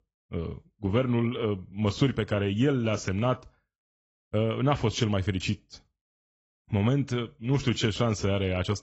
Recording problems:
garbled, watery; badly; nothing above 7.5 kHz

